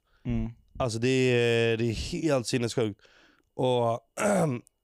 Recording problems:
none

